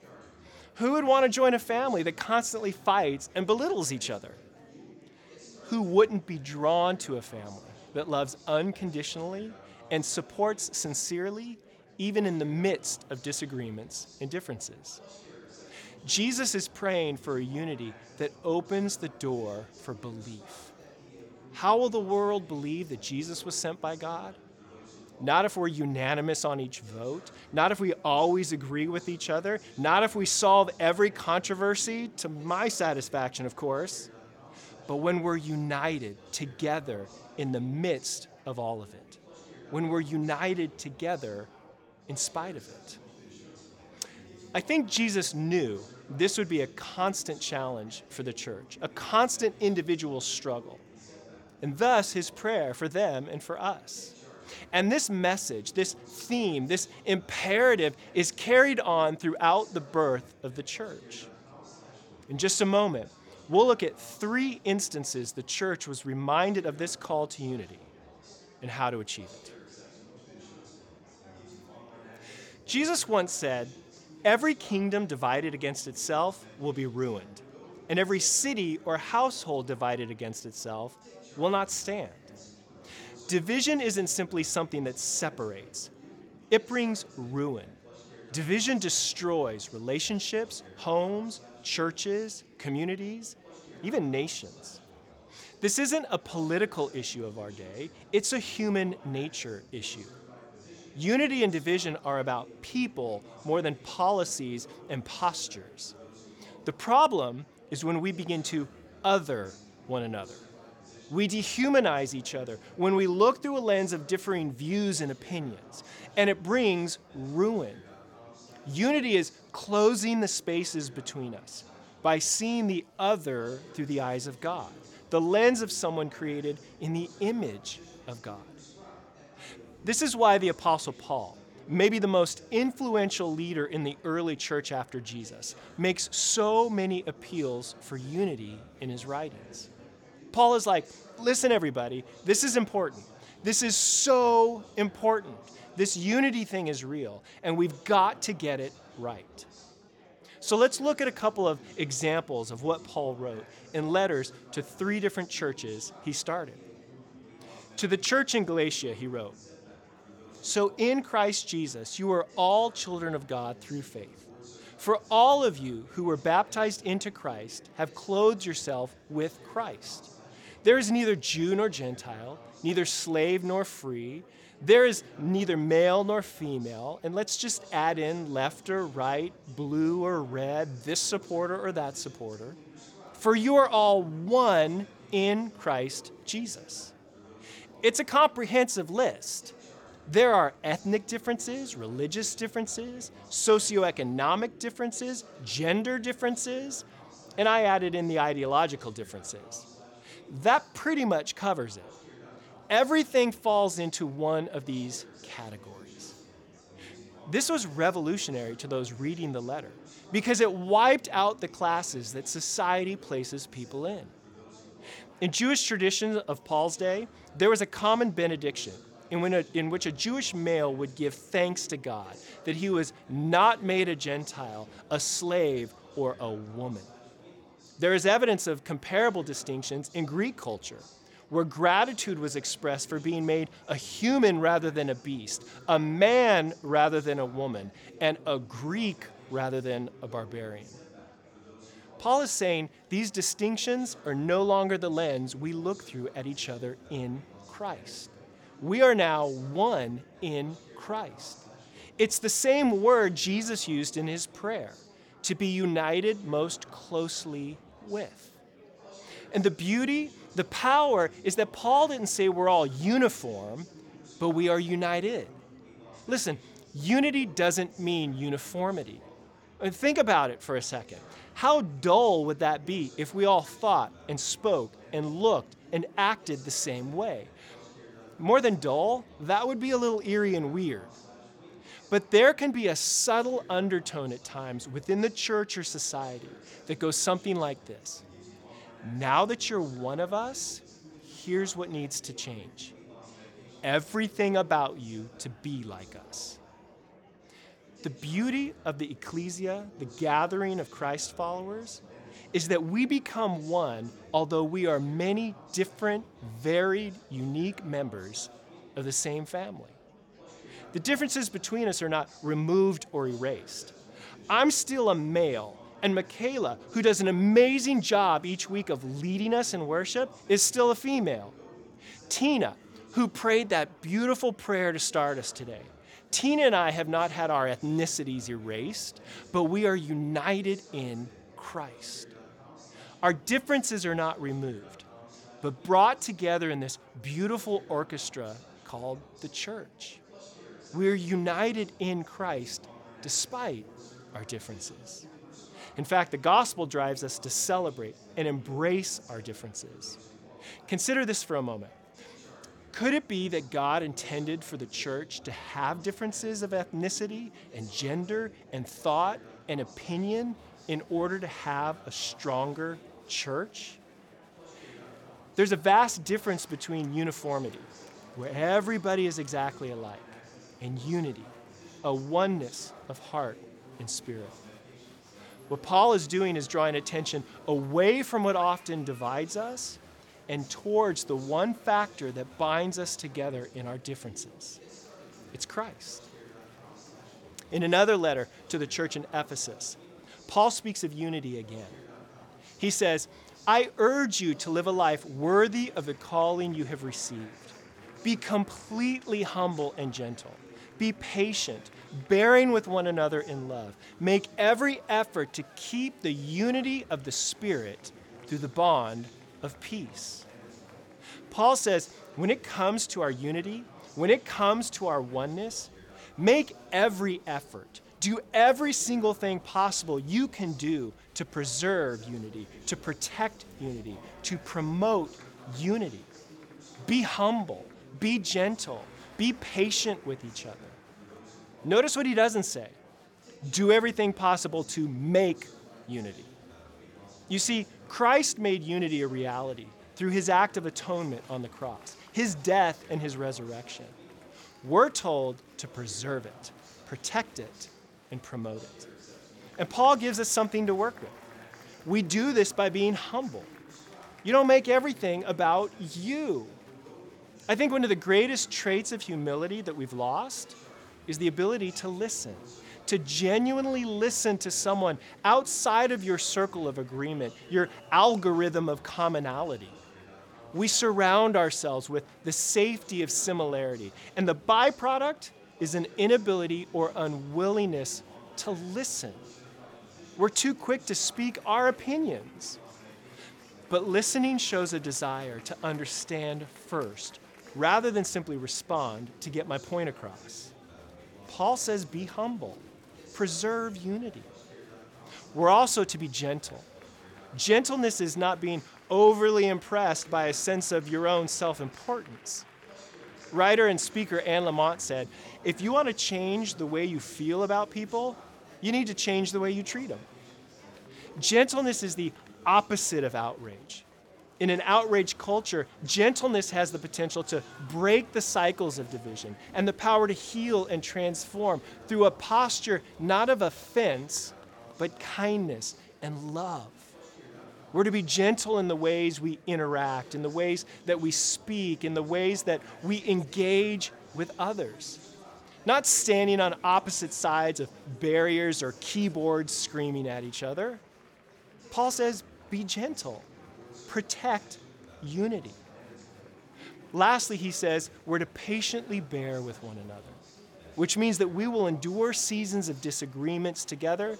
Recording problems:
murmuring crowd; faint; throughout; 25 dB below the speech

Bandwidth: 18 kHz